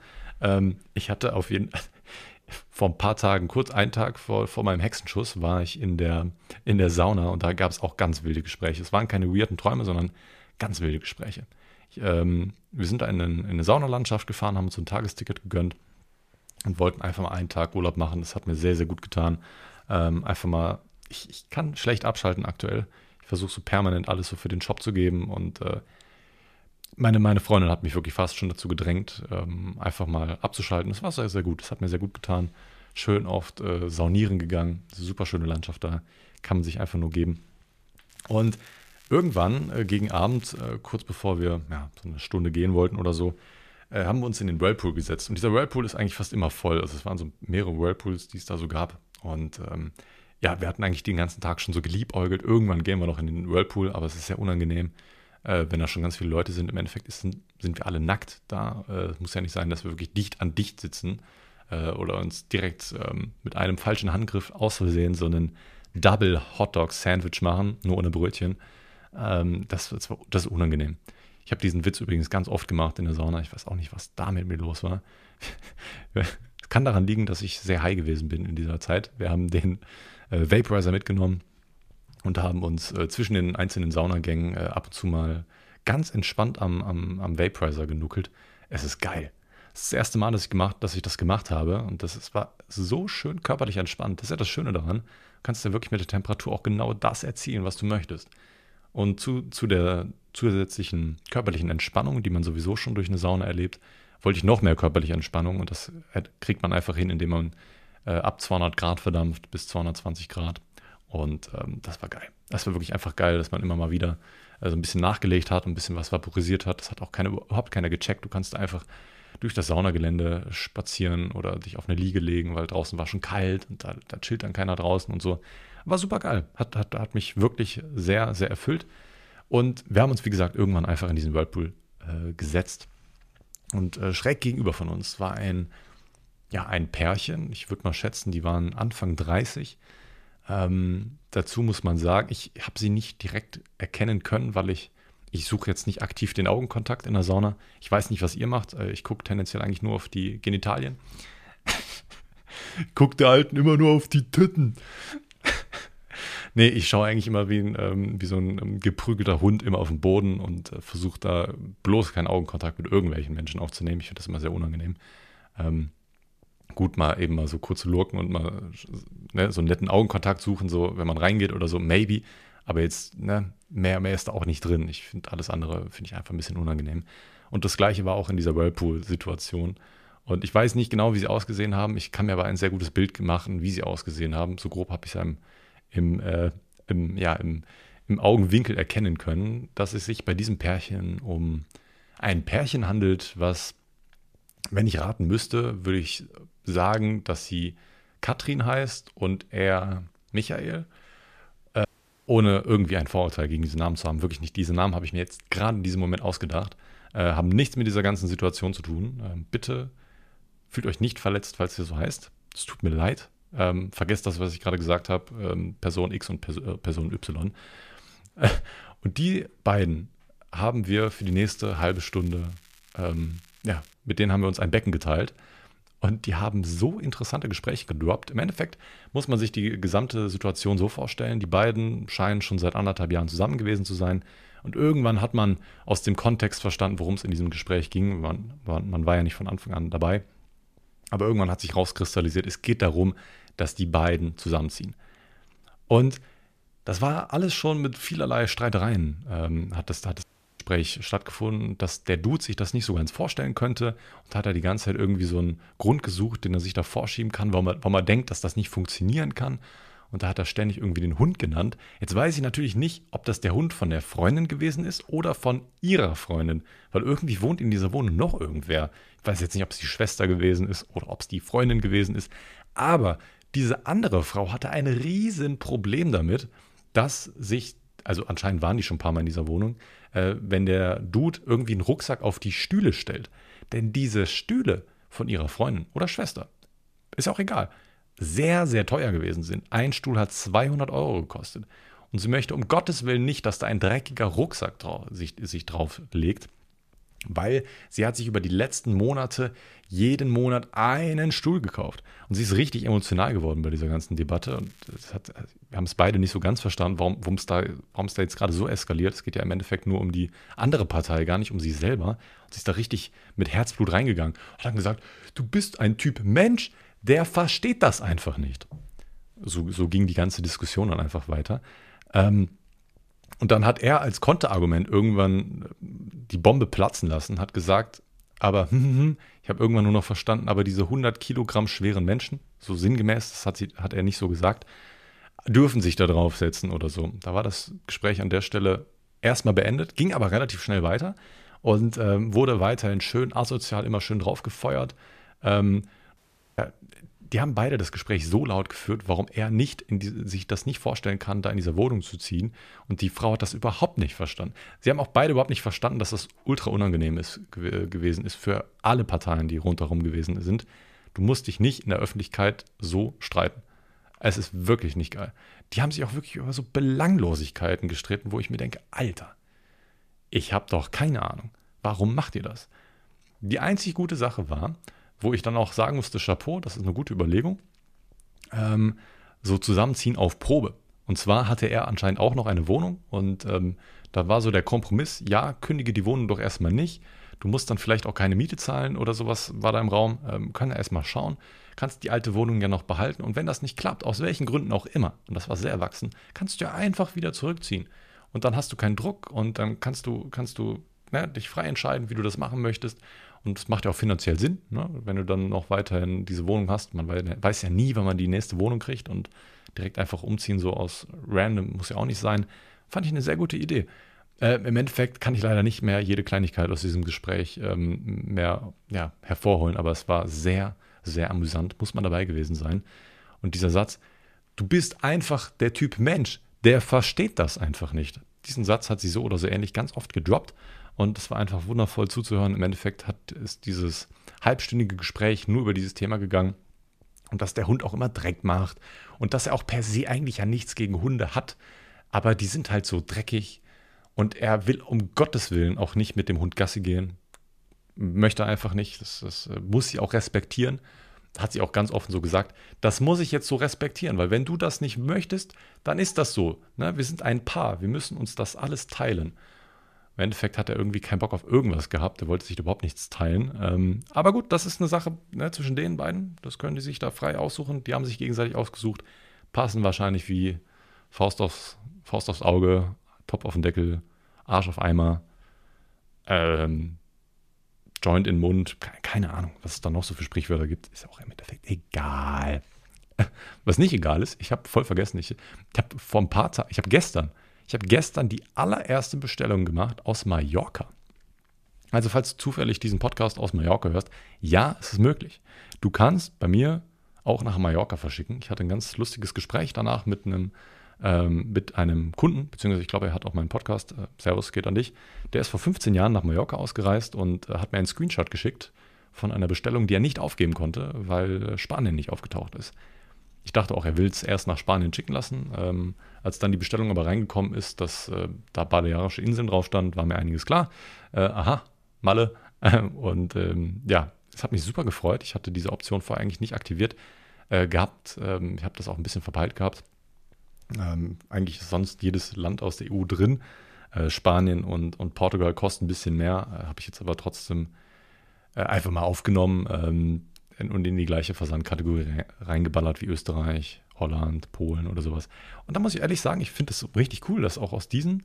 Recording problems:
crackling; faint; from 38 to 41 s, from 3:41 to 3:44 and at 5:04; 30 dB below the speech
audio cutting out; at 3:22, at 4:10 and at 5:46

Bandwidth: 14.5 kHz